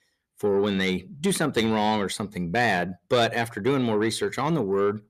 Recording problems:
distortion; slight; 10 dB below the speech

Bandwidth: 14 kHz